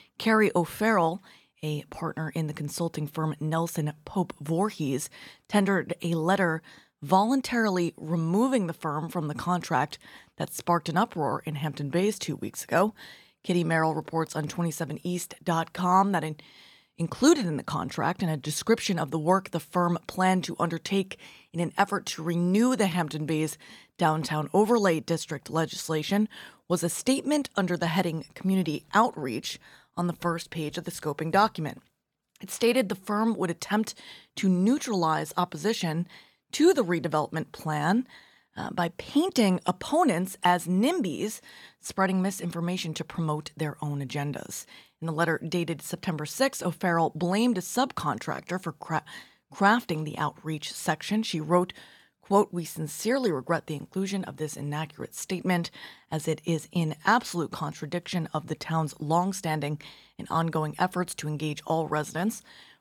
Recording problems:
none

